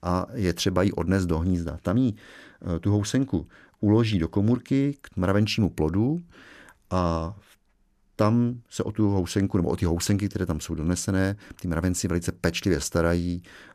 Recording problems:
none

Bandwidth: 14.5 kHz